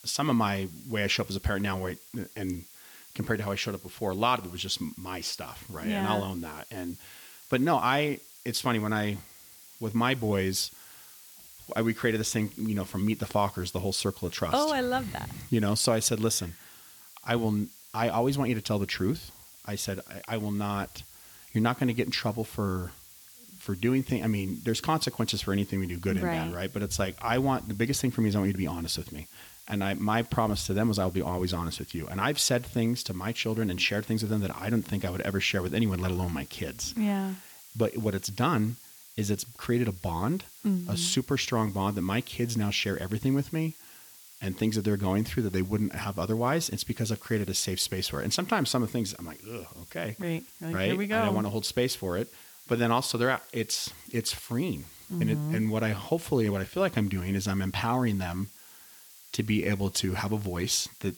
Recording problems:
hiss; noticeable; throughout; 20 dB below the speech

